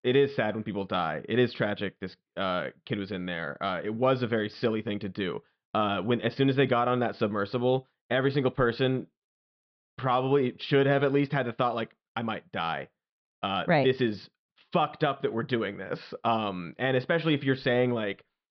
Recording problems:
high frequencies cut off; noticeable; nothing above 5.5 kHz
muffled; very slightly; fading above 3.5 kHz

